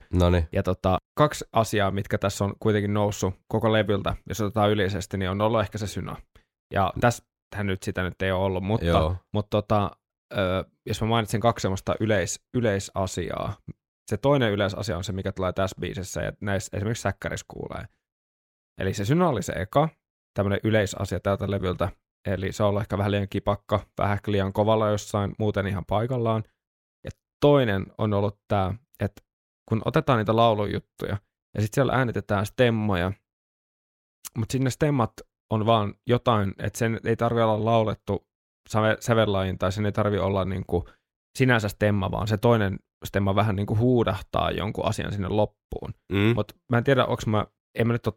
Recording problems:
none

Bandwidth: 16.5 kHz